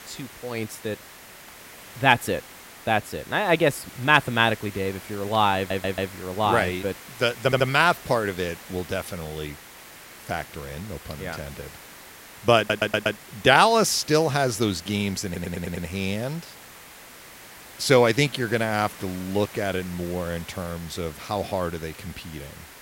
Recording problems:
hiss; noticeable; throughout; 20 dB below the speech
audio stuttering; 4 times, first at 5.5 s

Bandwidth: 16 kHz